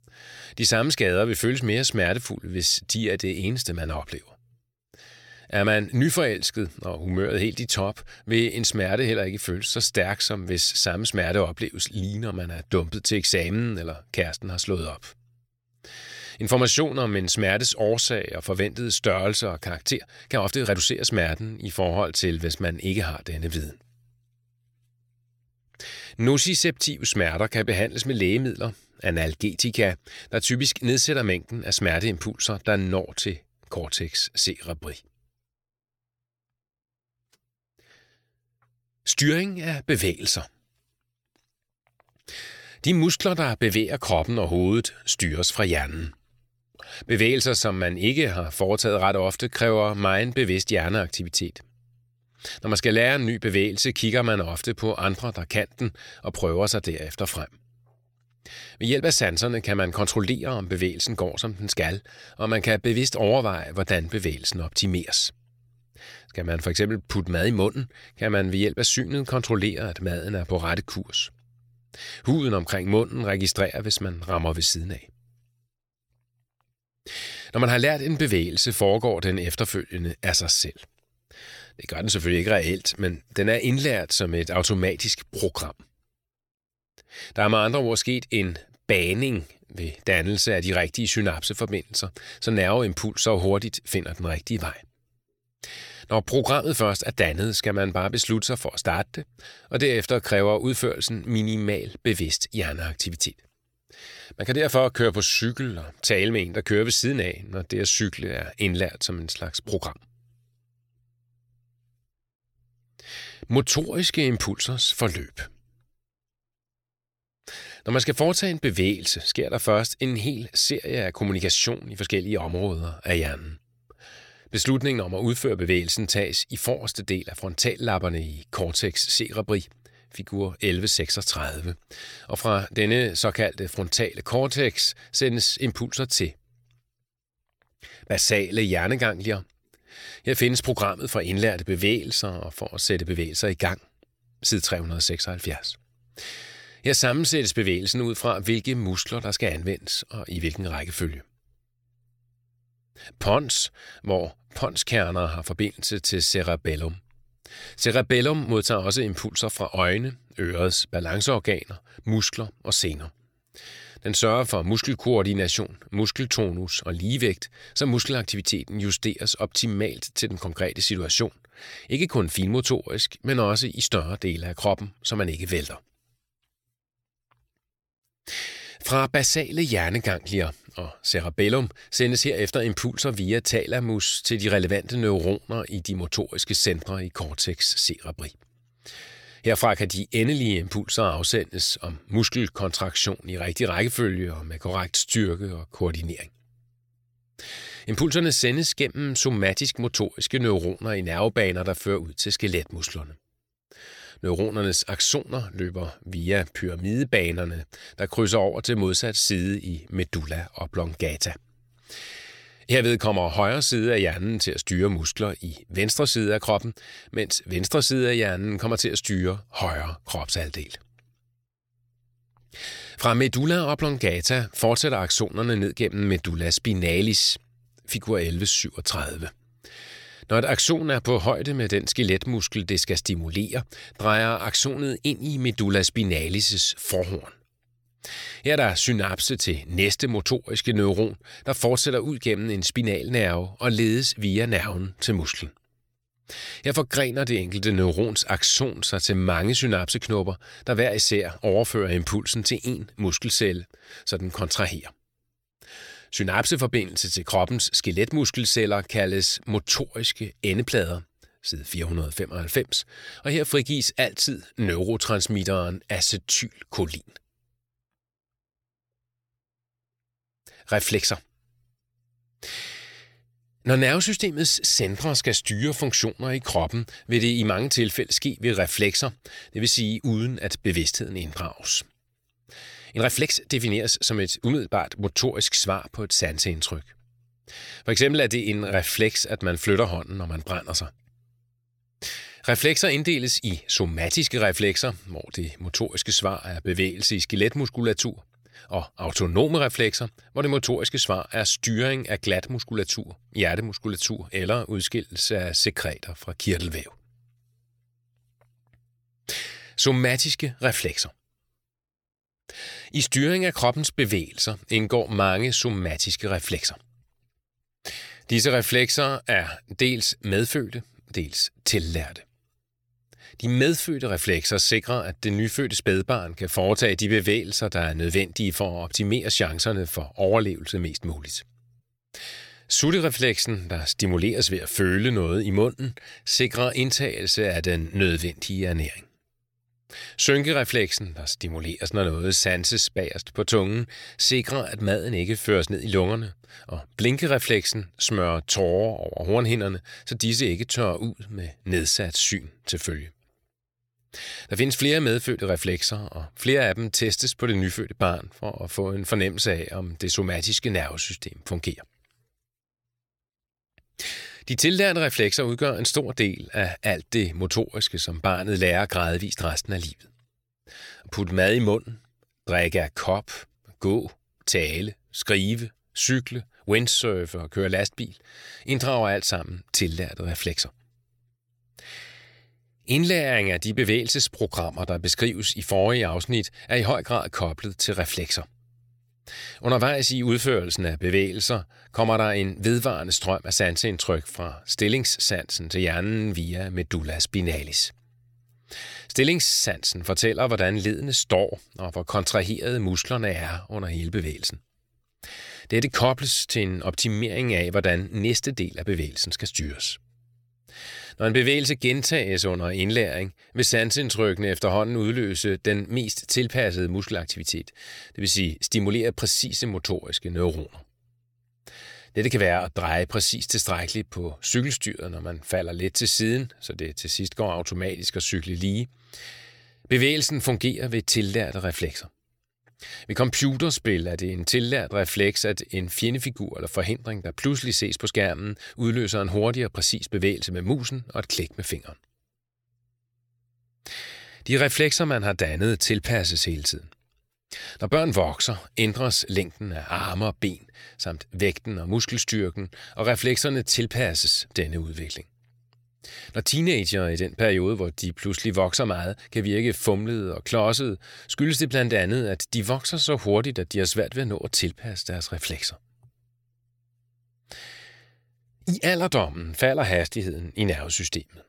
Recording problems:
uneven, jittery; strongly; from 20 s to 5:37

